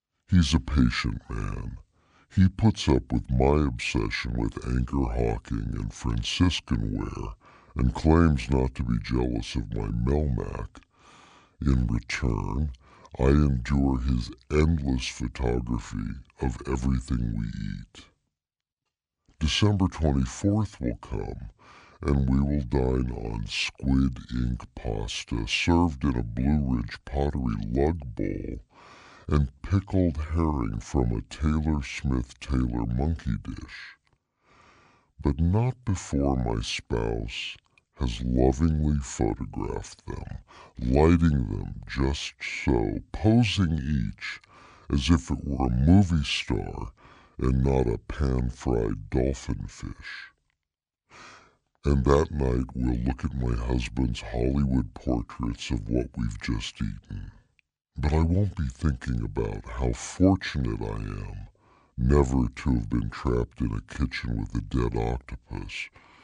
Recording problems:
wrong speed and pitch; too slow and too low; 0.7 times normal speed

